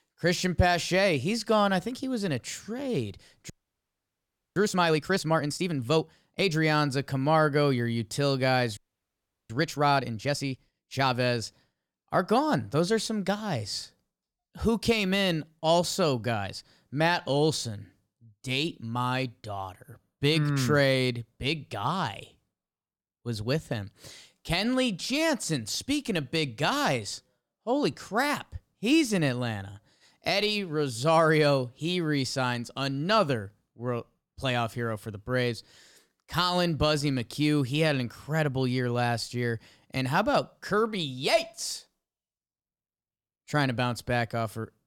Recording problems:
audio freezing; at 3.5 s for 1 s and at 9 s for 0.5 s

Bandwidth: 17 kHz